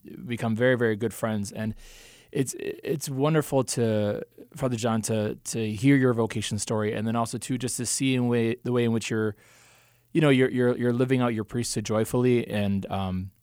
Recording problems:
none

